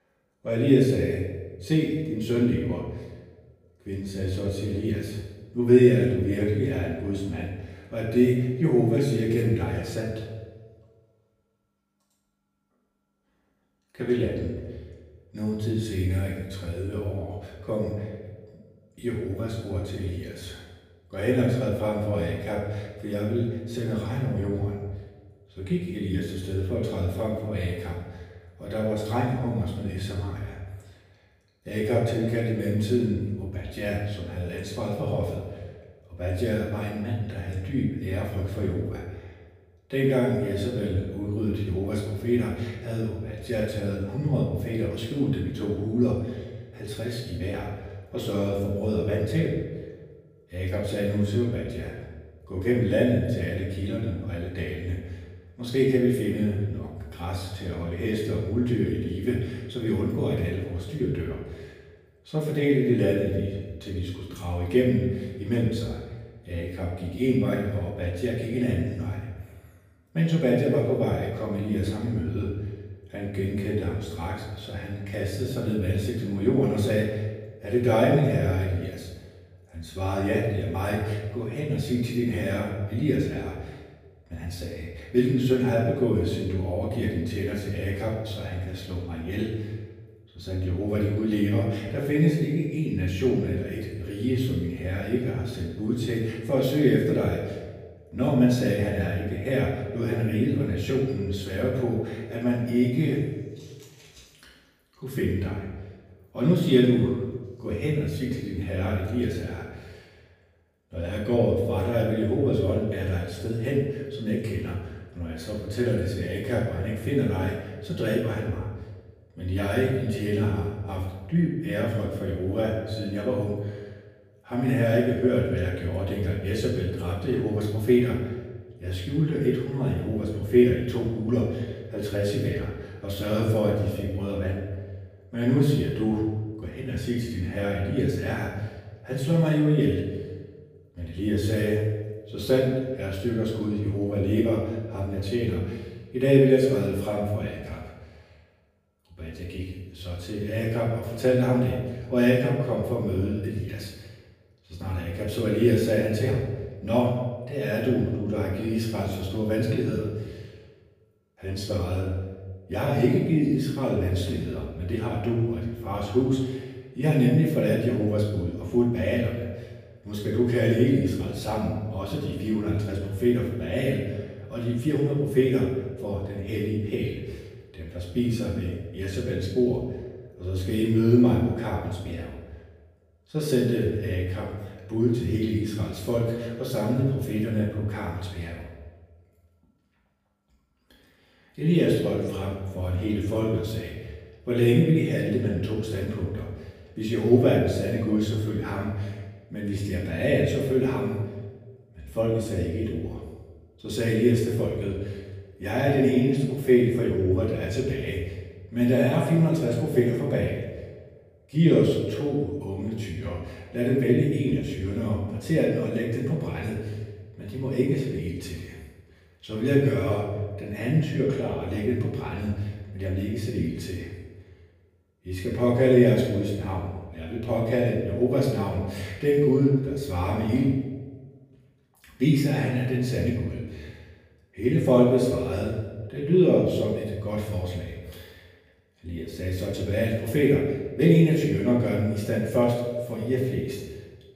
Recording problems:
off-mic speech; far
room echo; noticeable; dies away in 1 s

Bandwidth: 15 kHz